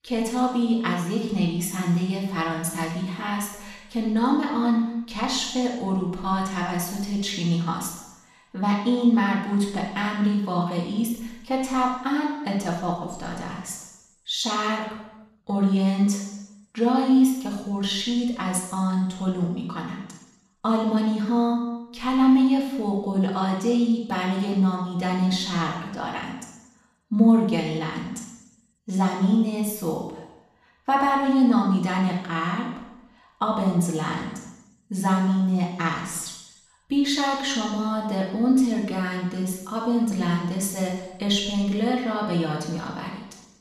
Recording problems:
off-mic speech; far
room echo; noticeable; dies away in 0.9 s

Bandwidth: 13.5 kHz